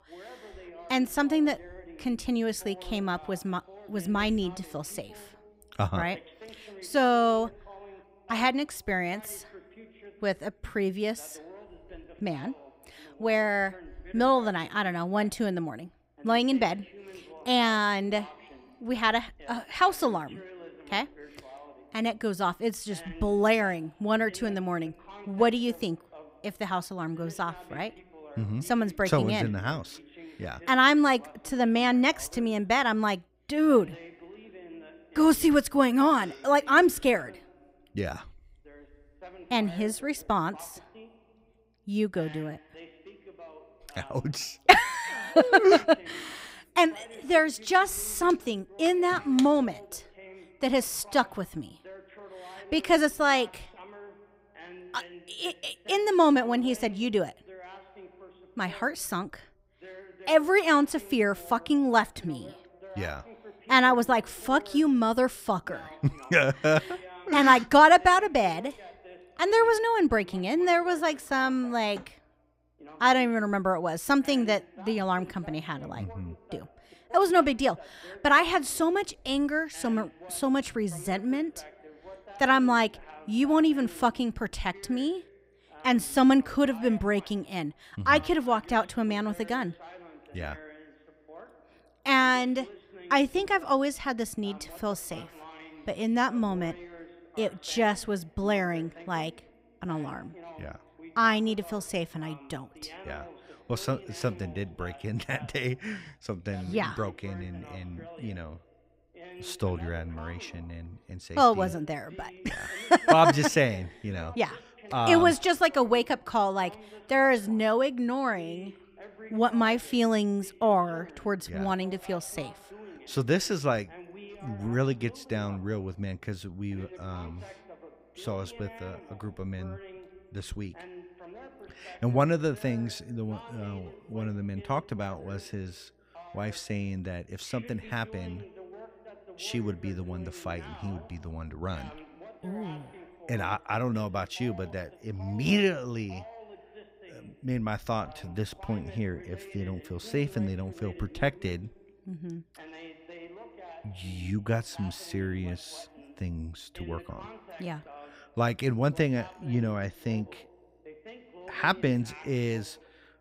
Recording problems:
voice in the background; faint; throughout; 20 dB below the speech

